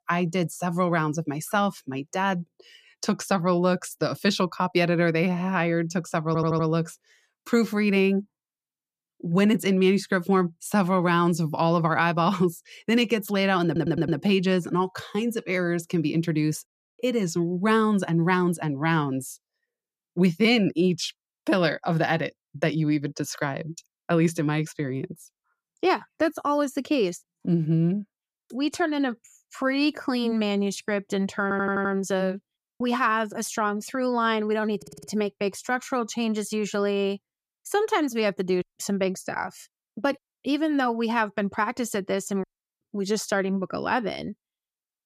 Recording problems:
audio stuttering; 4 times, first at 6.5 s

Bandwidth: 14.5 kHz